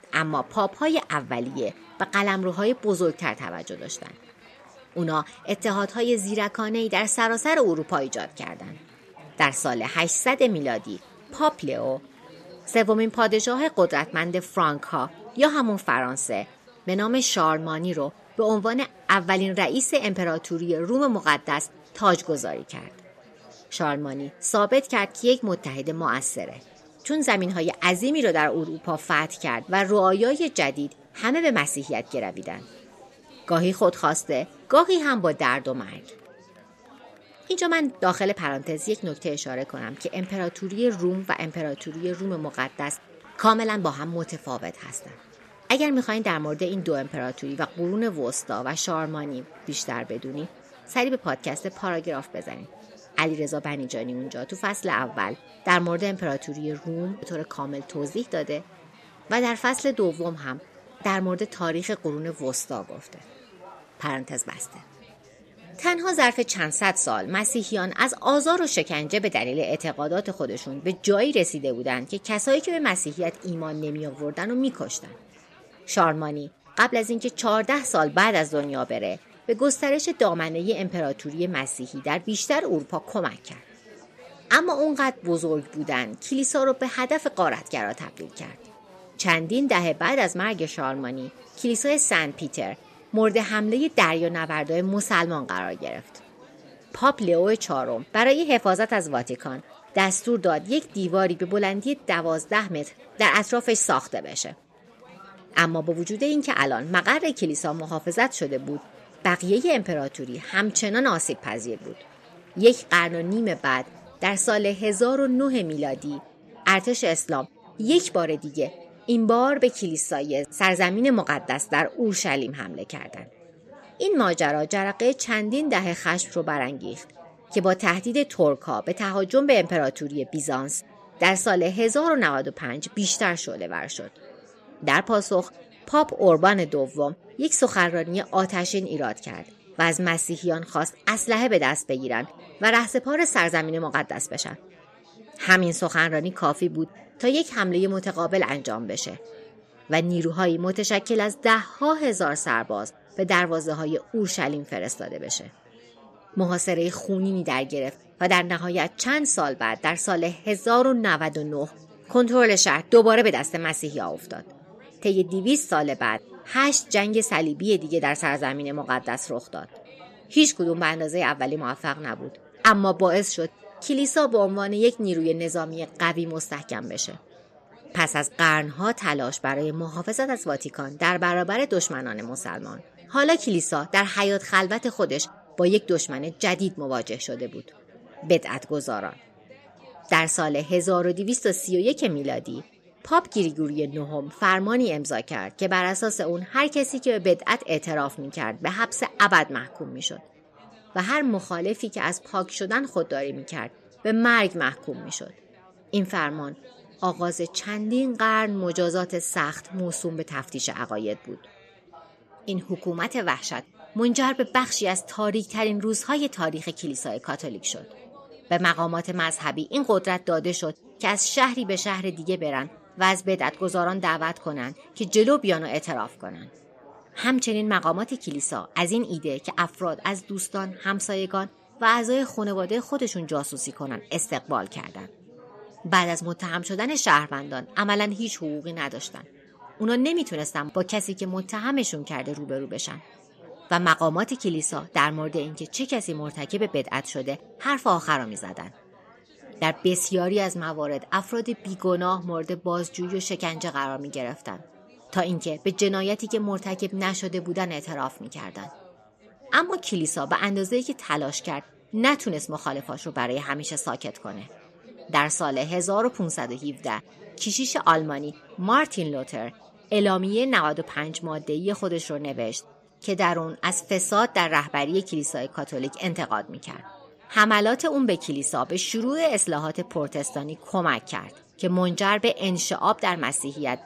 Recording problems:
chatter from many people; faint; throughout; 25 dB below the speech

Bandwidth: 14 kHz